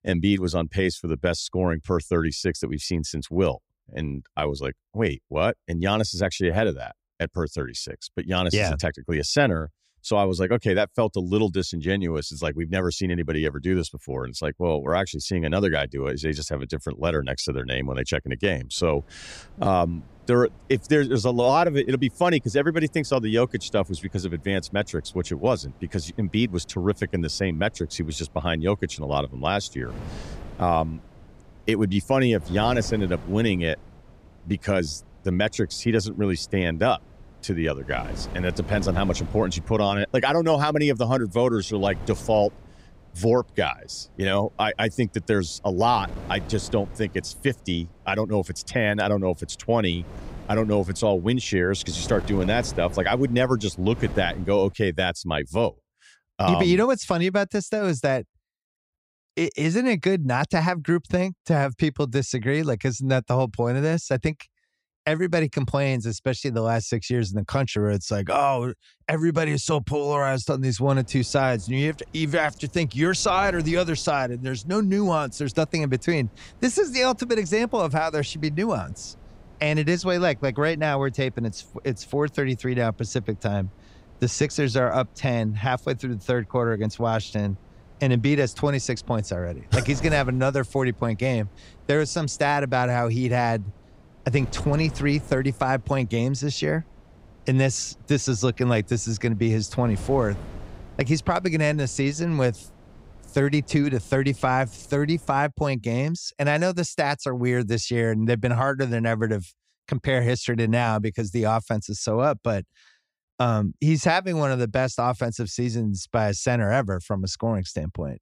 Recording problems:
wind noise on the microphone; occasional gusts; from 19 to 55 s and from 1:11 to 1:45; 25 dB below the speech

